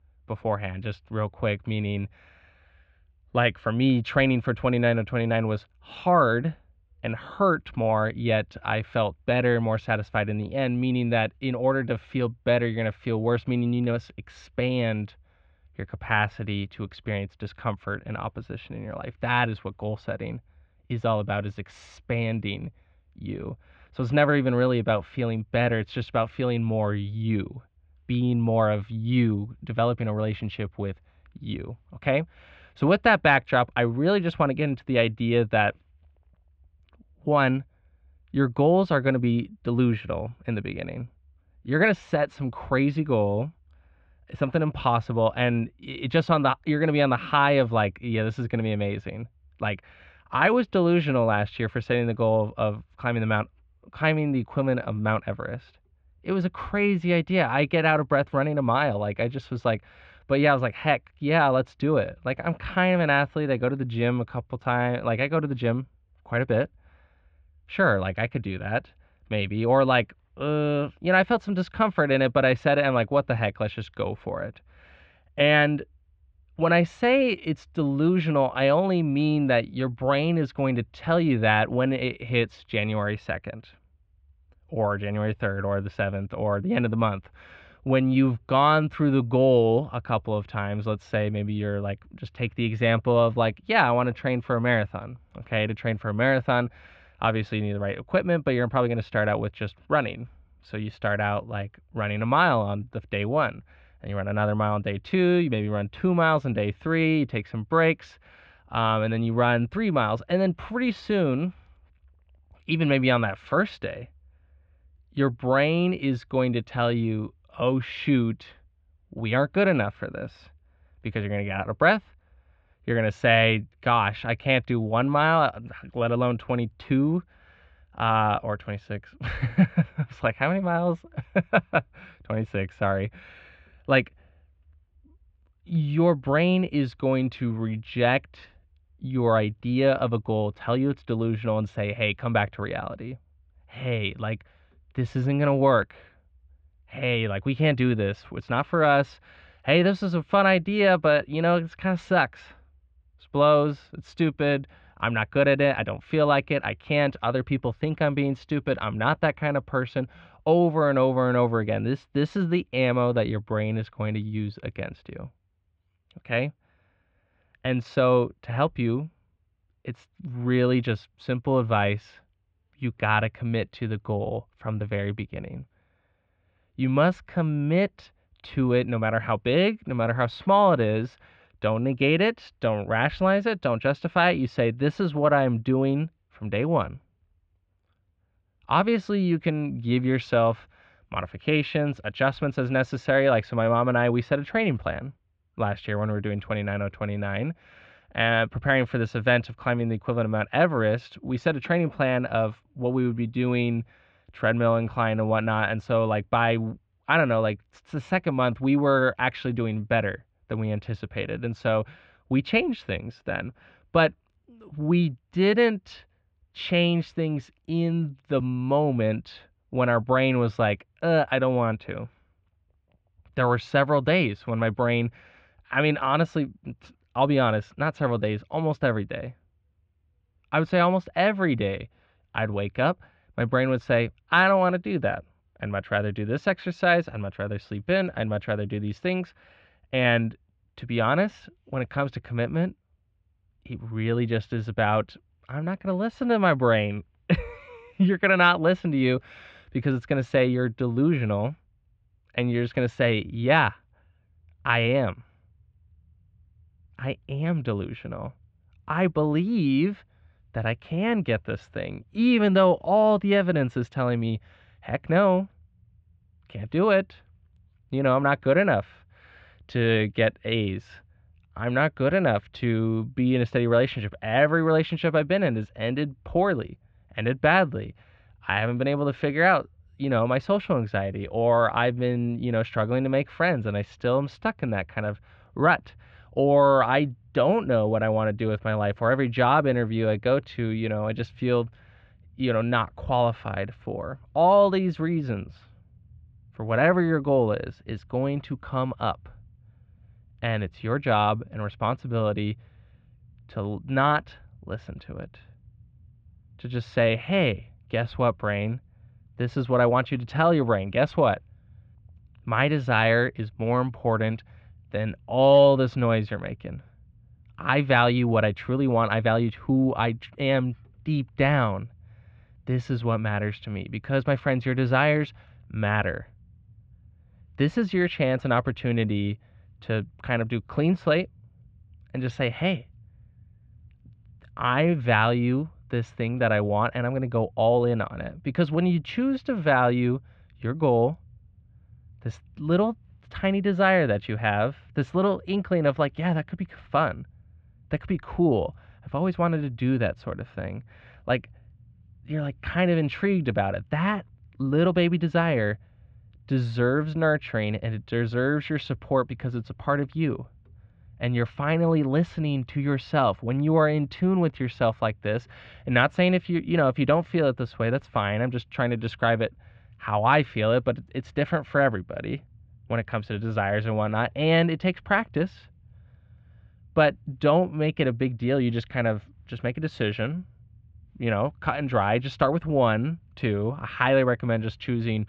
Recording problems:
muffled; very; fading above 3 kHz

